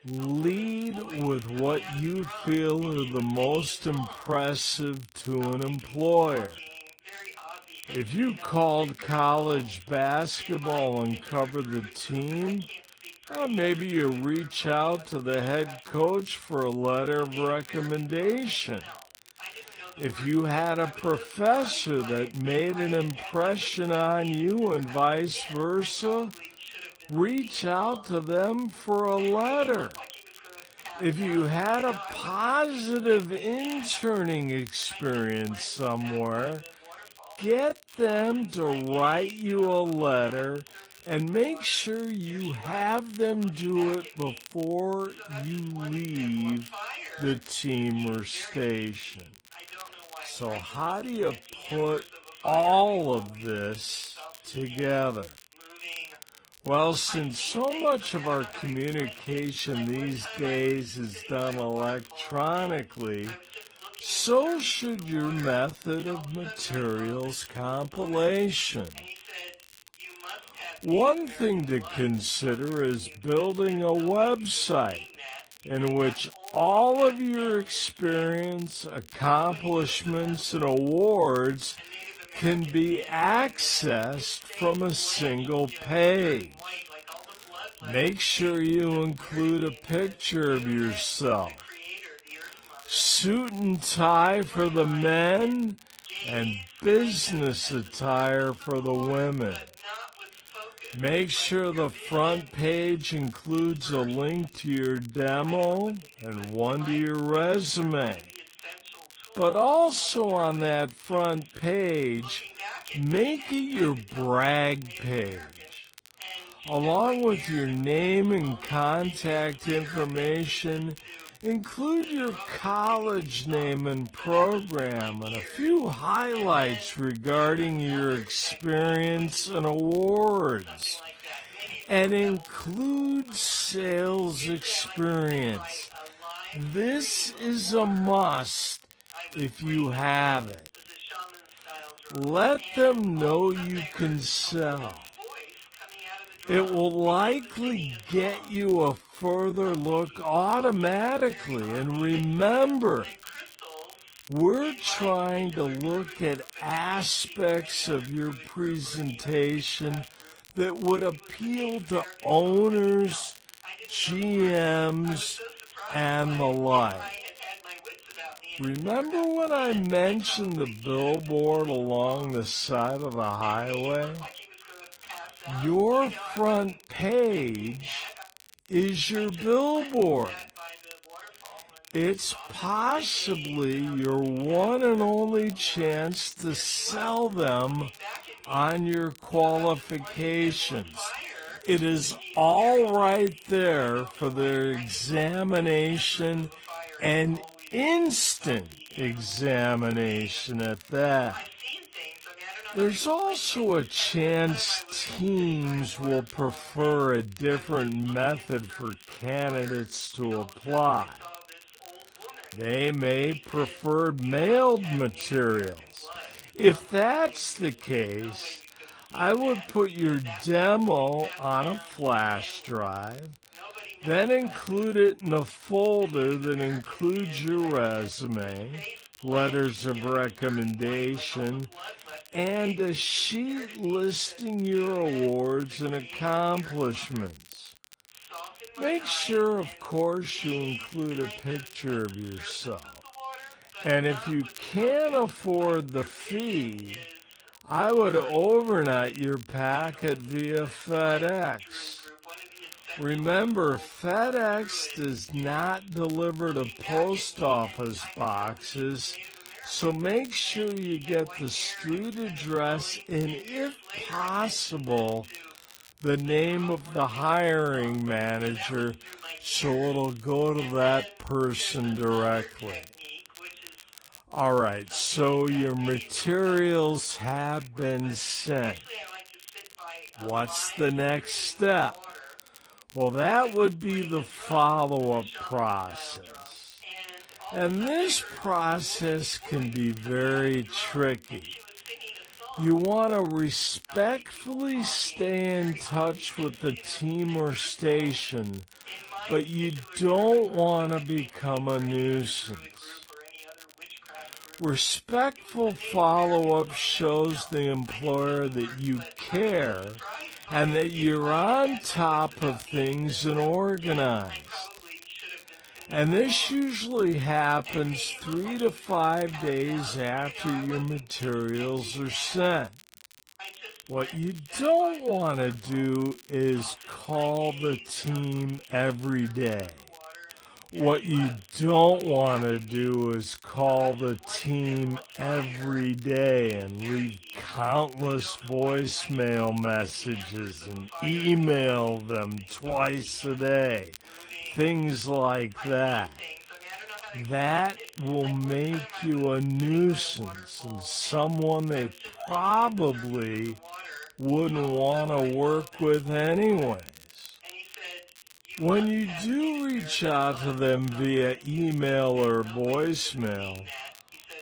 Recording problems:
wrong speed, natural pitch; too slow; 0.5 times normal speed
garbled, watery; slightly; nothing above 10 kHz
voice in the background; noticeable; throughout; 15 dB below the speech
crackle, like an old record; faint; 25 dB below the speech

